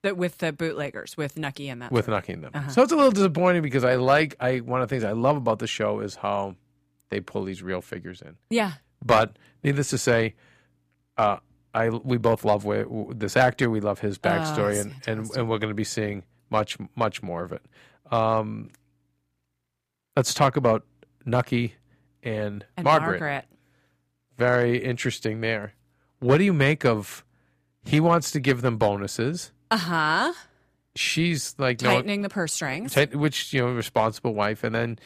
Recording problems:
none

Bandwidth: 15 kHz